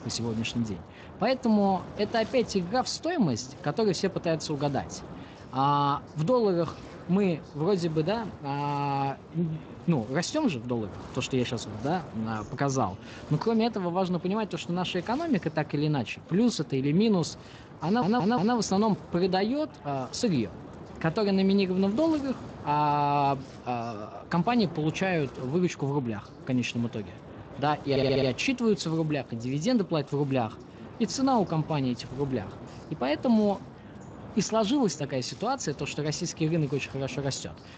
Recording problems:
garbled, watery; slightly; nothing above 7.5 kHz
wind noise on the microphone; occasional gusts; 20 dB below the speech
voice in the background; faint; throughout; 25 dB below the speech
audio stuttering; at 18 s and at 28 s

